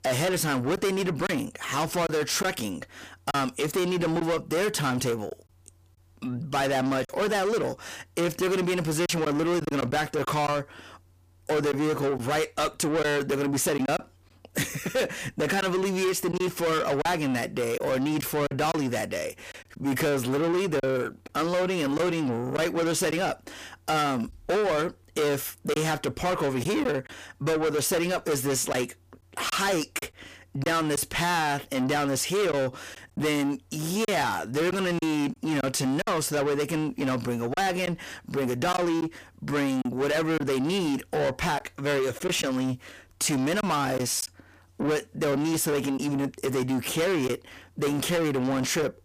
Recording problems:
distortion; heavy; 6 dB below the speech
choppy; occasionally; 3% of the speech affected

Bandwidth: 15 kHz